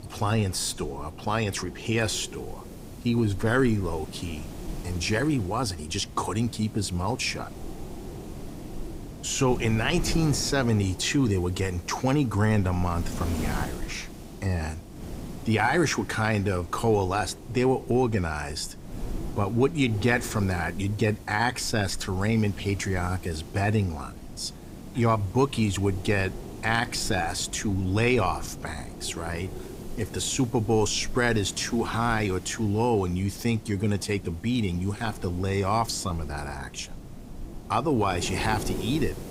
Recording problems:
wind noise on the microphone; occasional gusts; 15 dB below the speech

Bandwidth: 15.5 kHz